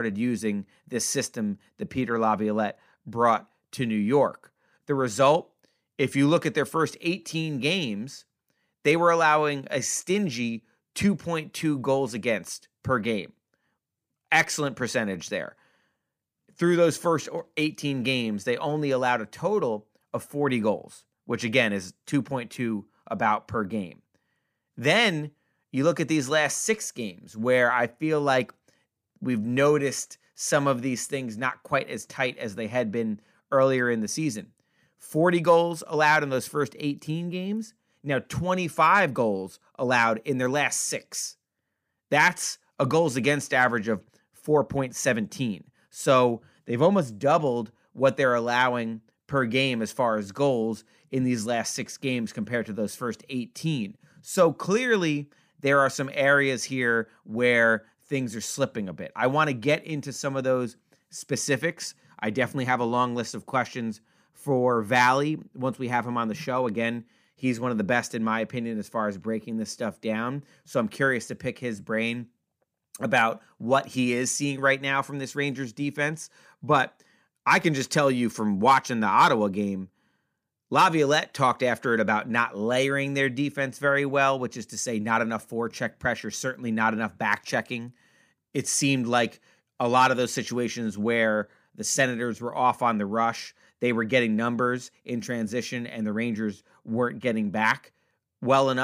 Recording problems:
abrupt cut into speech; at the start and the end

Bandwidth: 15 kHz